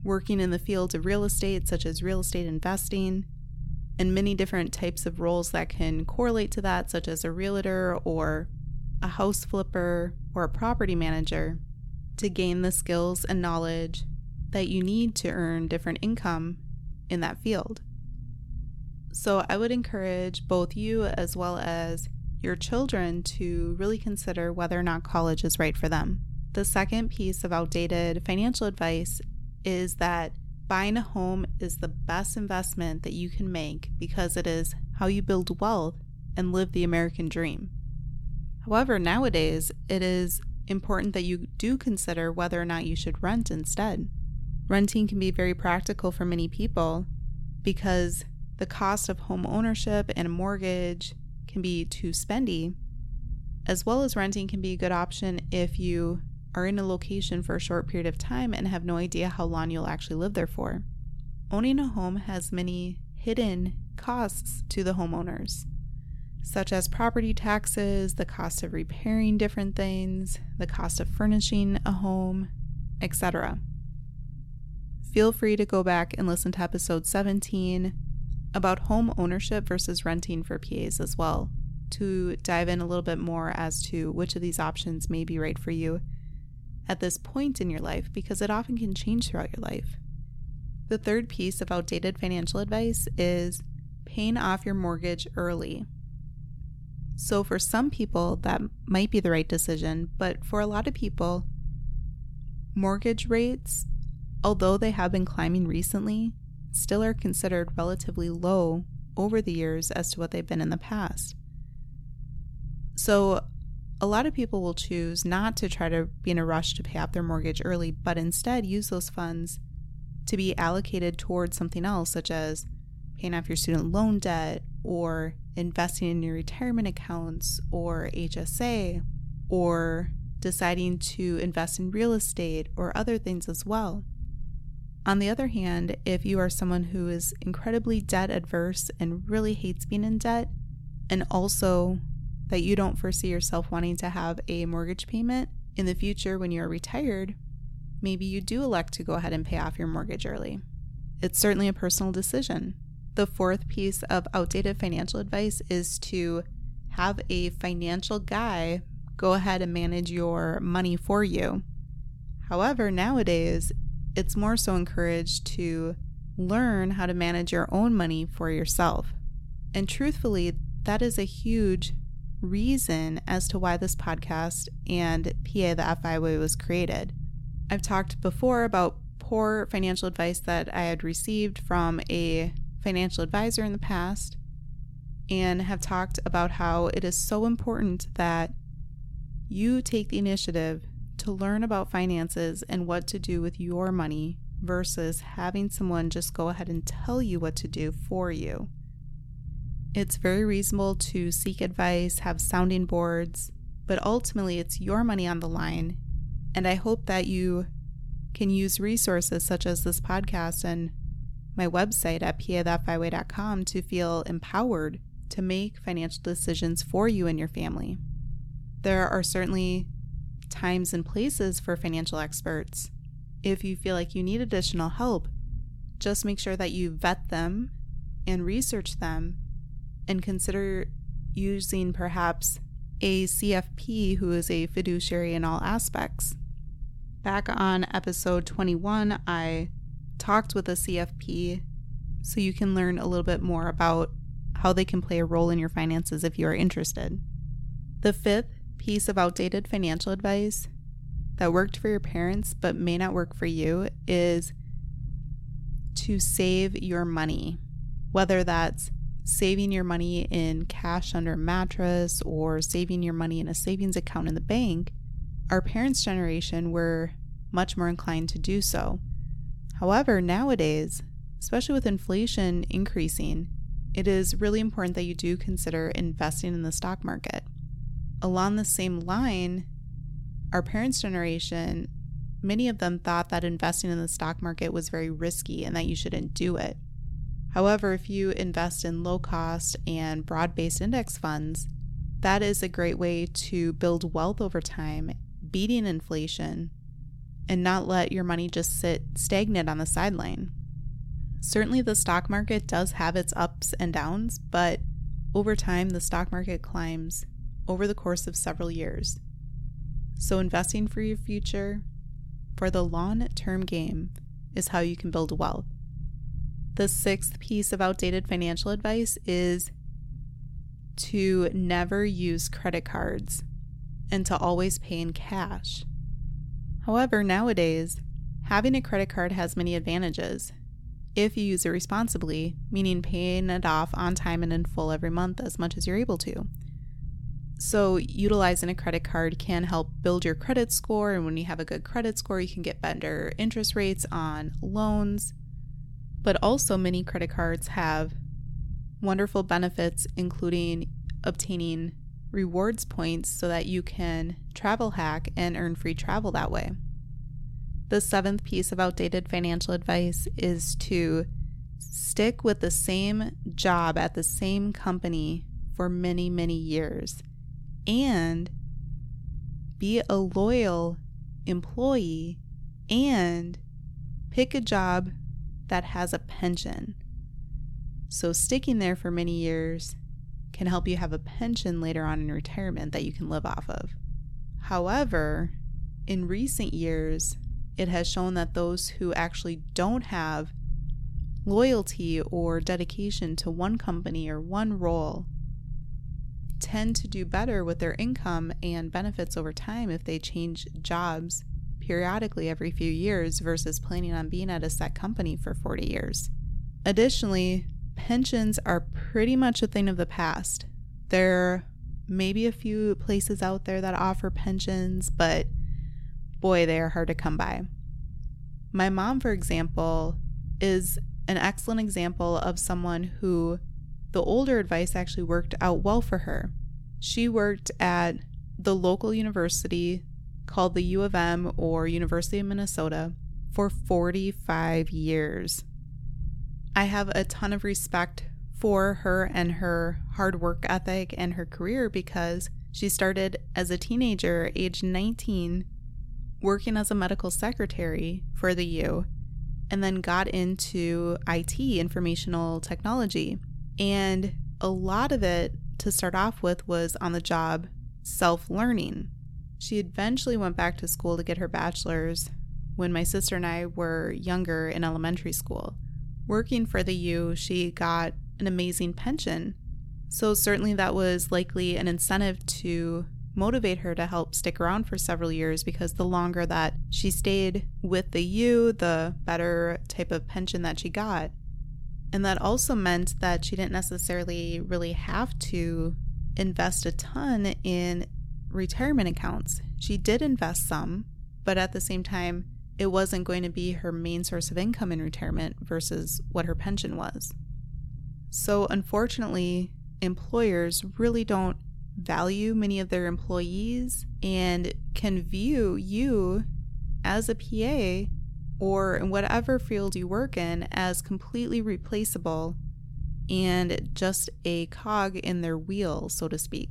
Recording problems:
low rumble; faint; throughout; 25 dB below the speech

